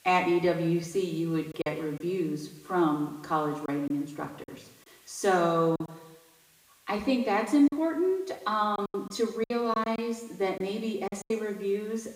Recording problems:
off-mic speech; far
room echo; noticeable; dies away in 0.8 s
hiss; faint; throughout; 30 dB below the speech
choppy; very; 6% of the speech affected

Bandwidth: 15.5 kHz